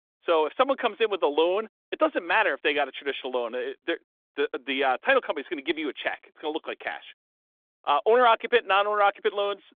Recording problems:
phone-call audio; nothing above 3.5 kHz

